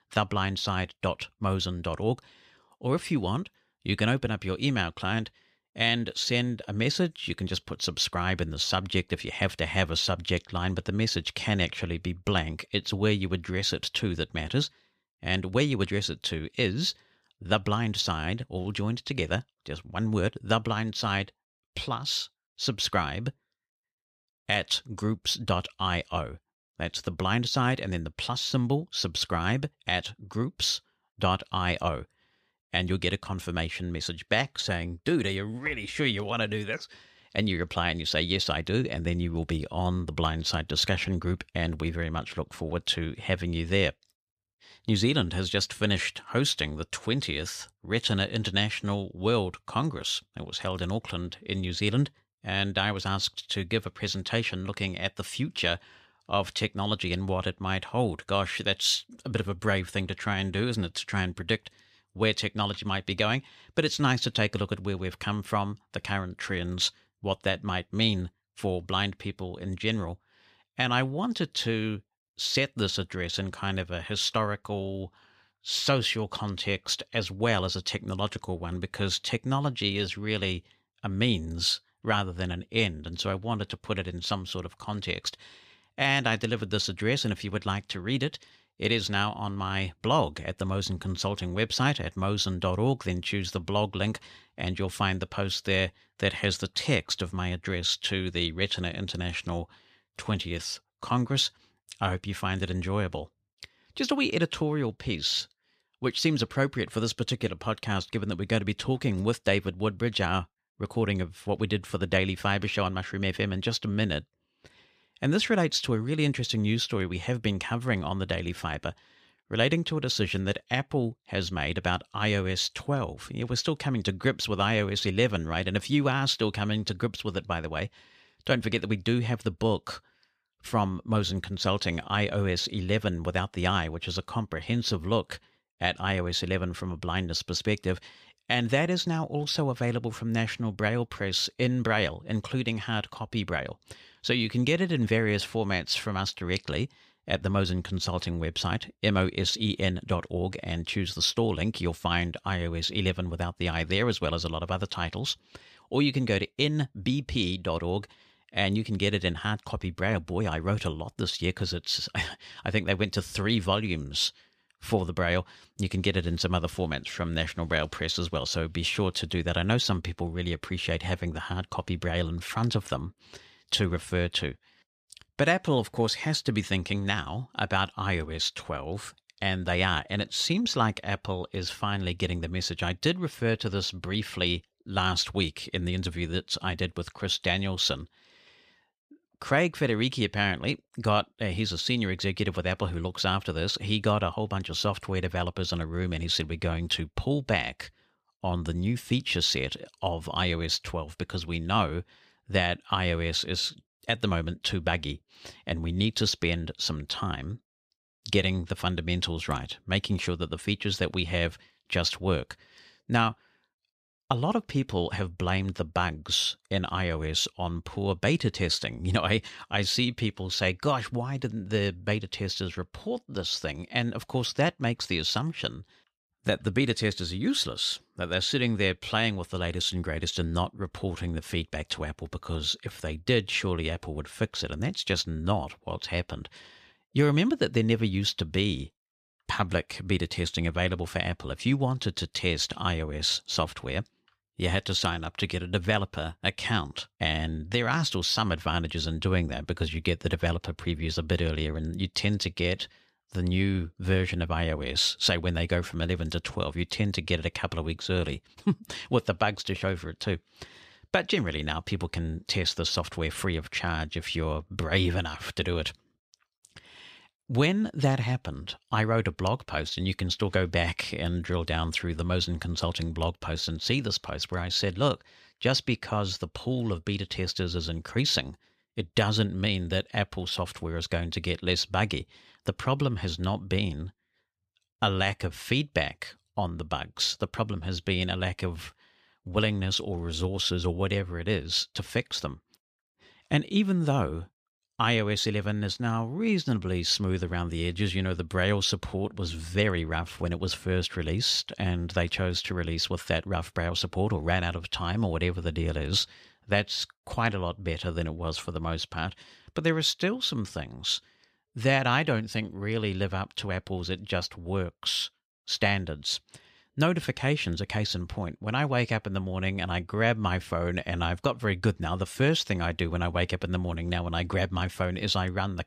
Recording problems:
none

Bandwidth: 14.5 kHz